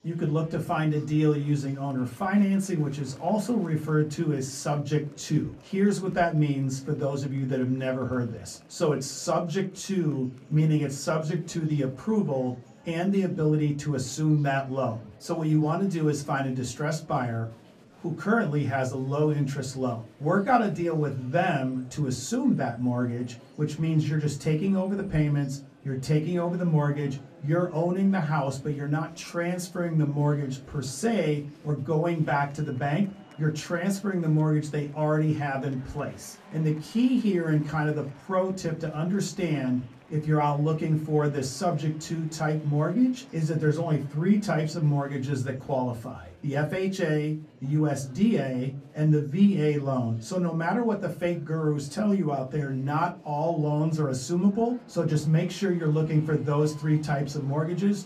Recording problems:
off-mic speech; far
room echo; very slight; dies away in 0.2 s
murmuring crowd; faint; throughout; 25 dB below the speech

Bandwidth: 14.5 kHz